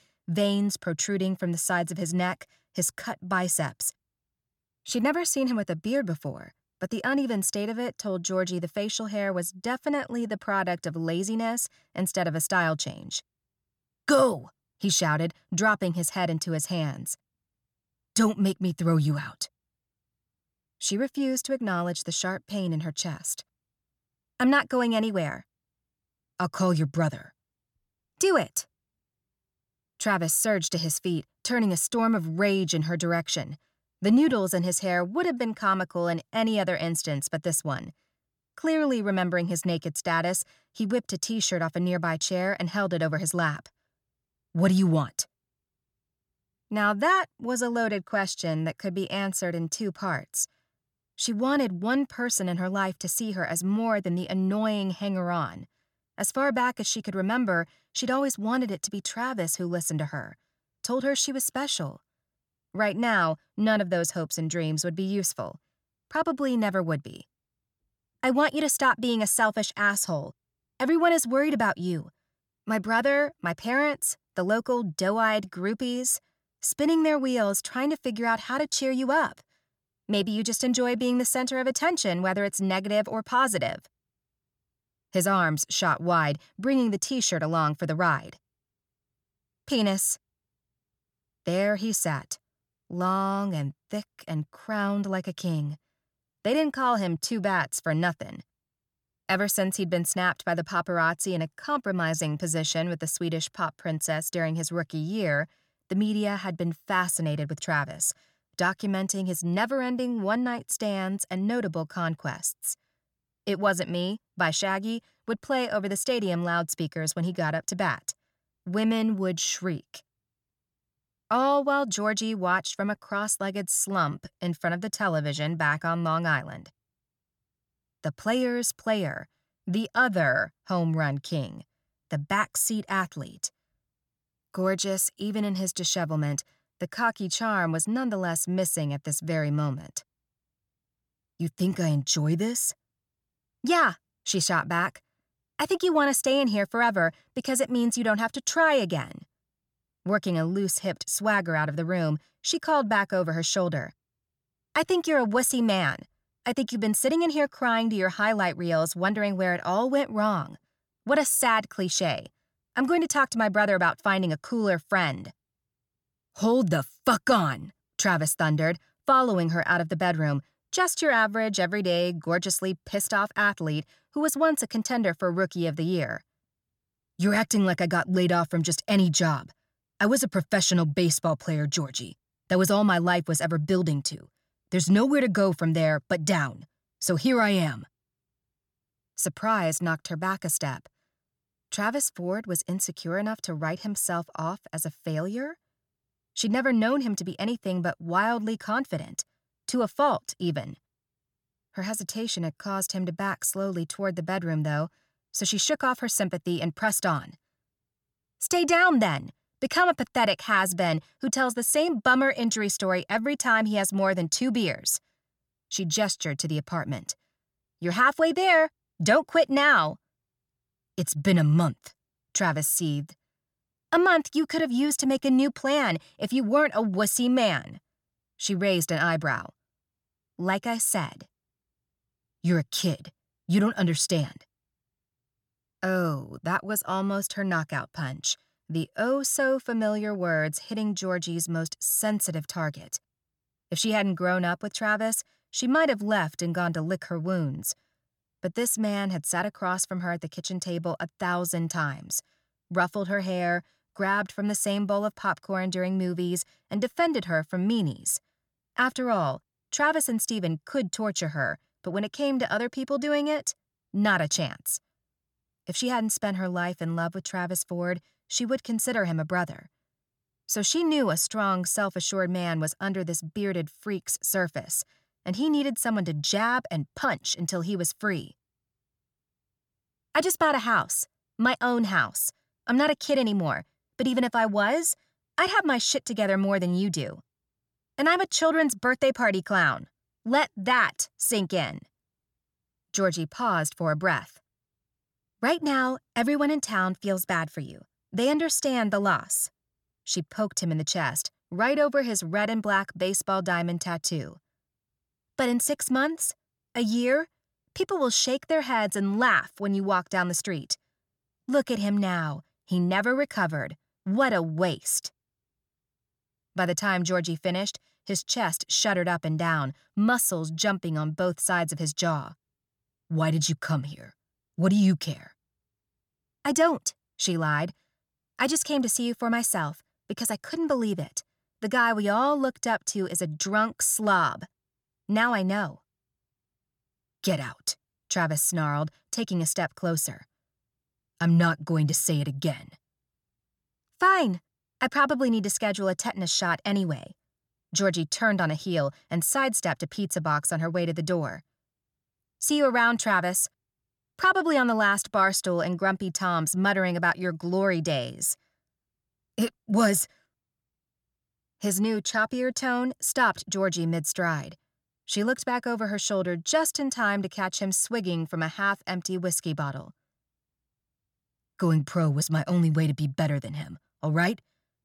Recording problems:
none

